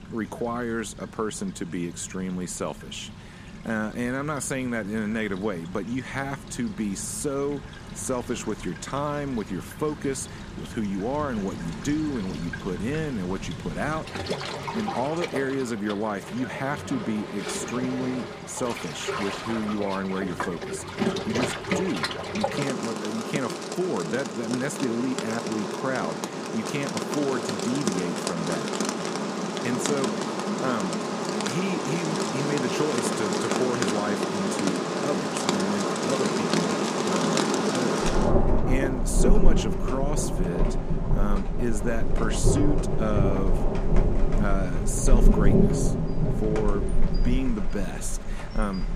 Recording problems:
rain or running water; very loud; throughout; 2 dB above the speech

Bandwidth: 14.5 kHz